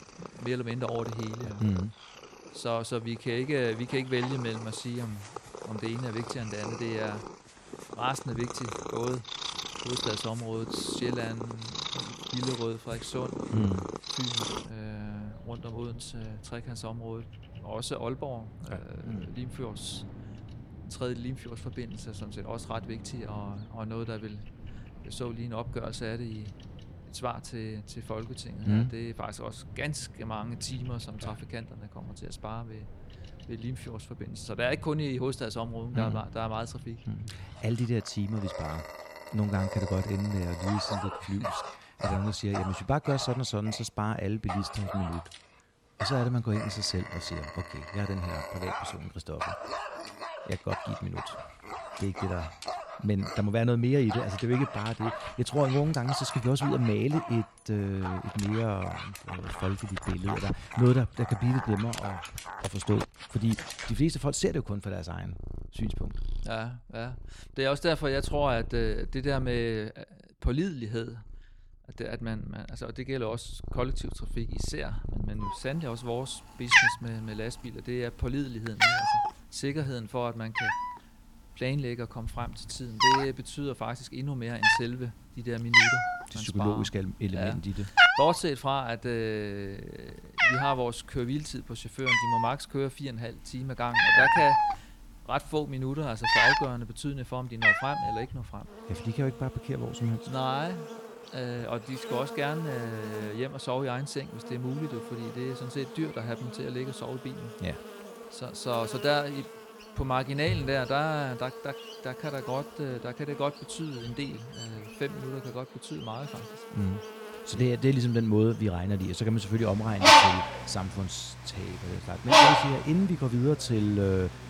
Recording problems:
animal sounds; very loud; throughout; 4 dB above the speech

